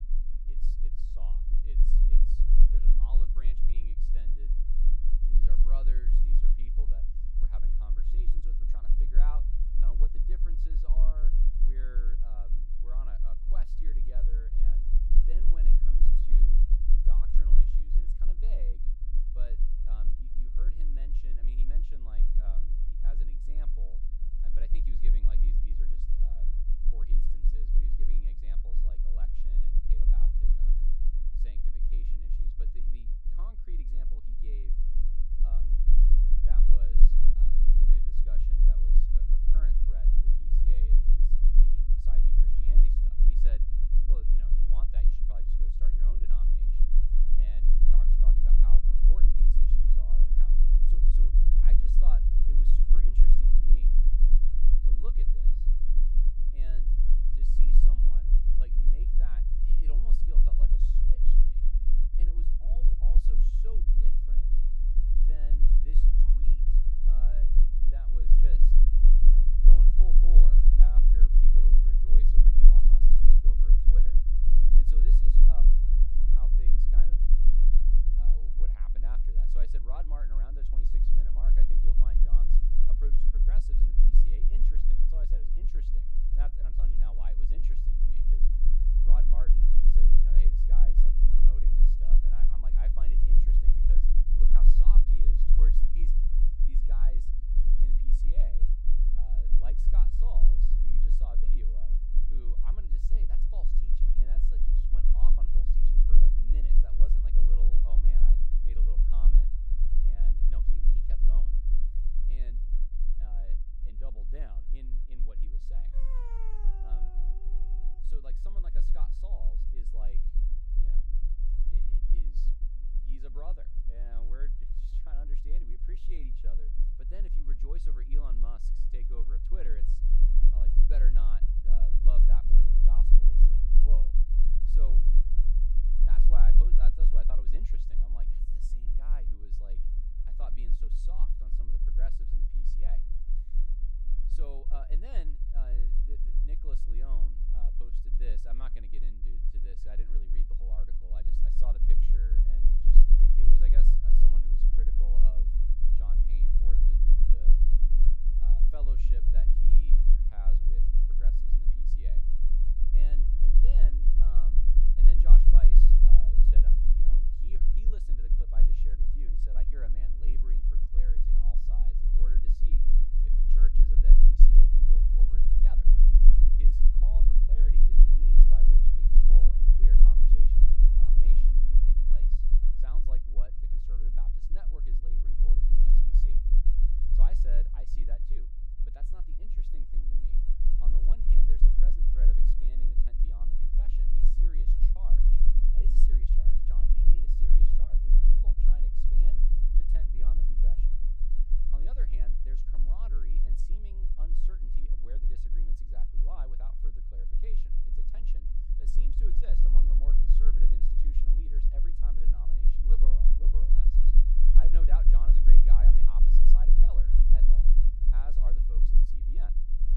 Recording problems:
low rumble; loud; throughout; as loud as the speech
dog barking; loud; from 1:56 to 1:58; peak 3 dB above the speech

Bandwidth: 16 kHz